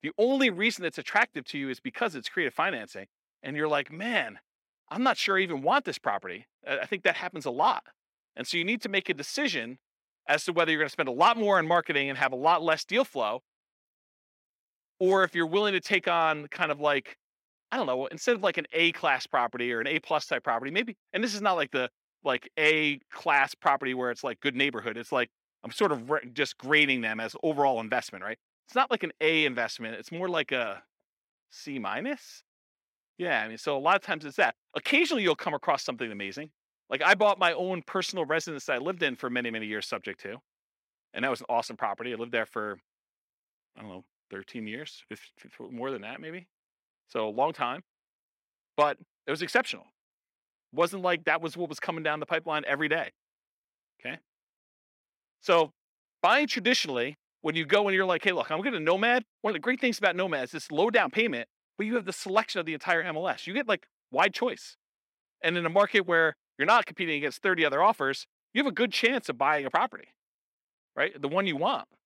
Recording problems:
thin; very slightly; fading below 250 Hz

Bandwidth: 16 kHz